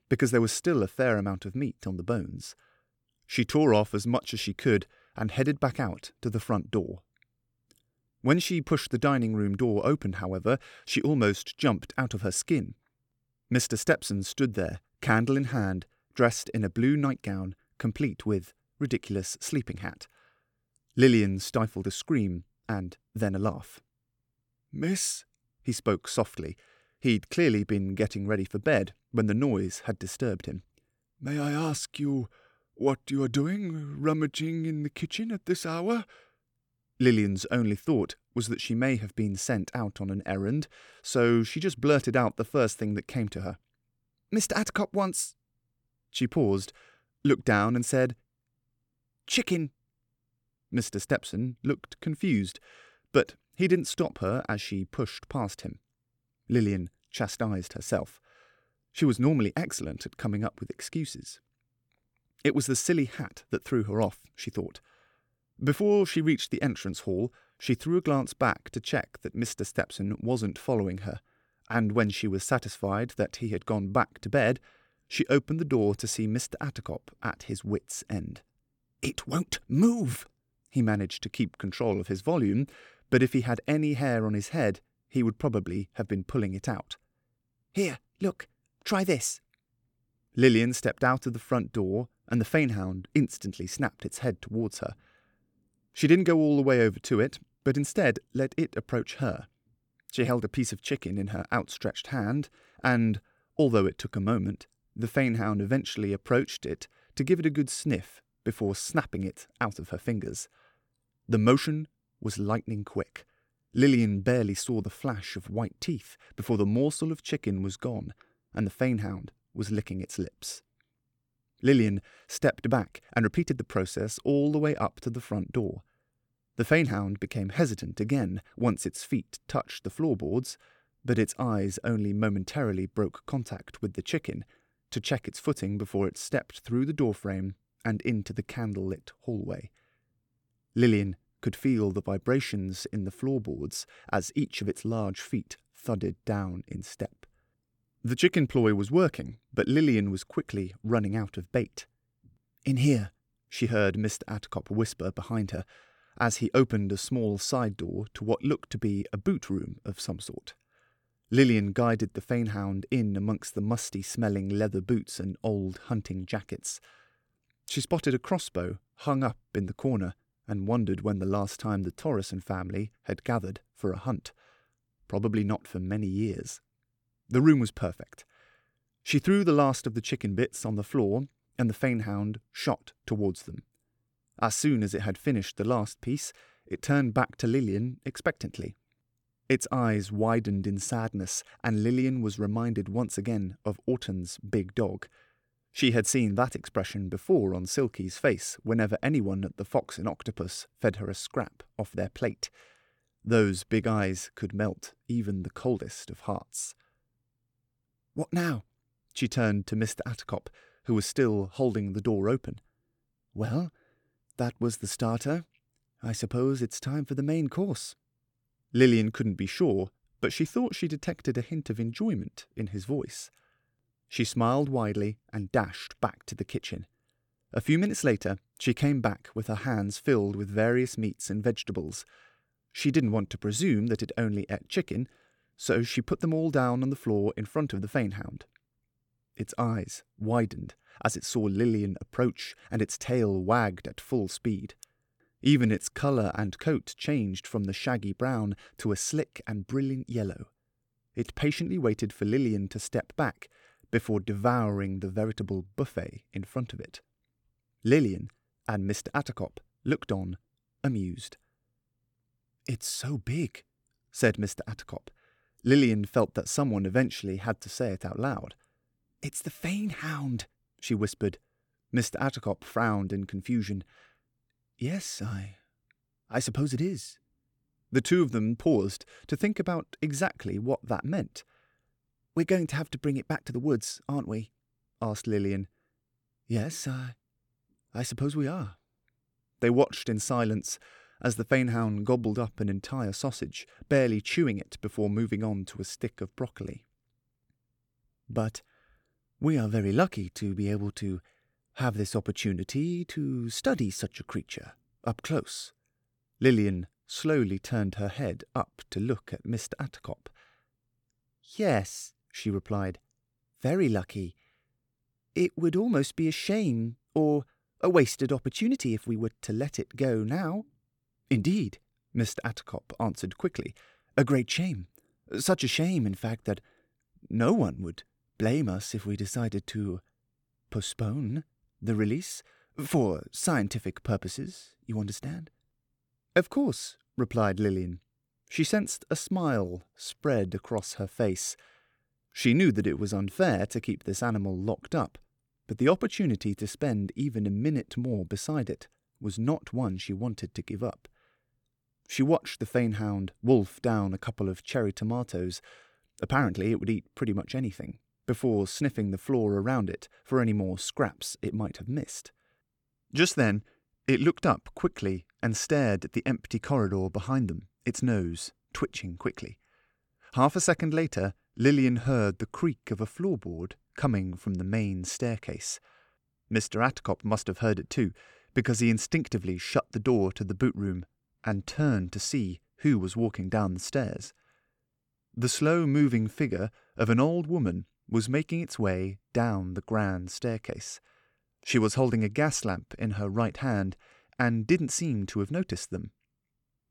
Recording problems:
uneven, jittery; strongly; from 23 s to 6:22

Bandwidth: 18 kHz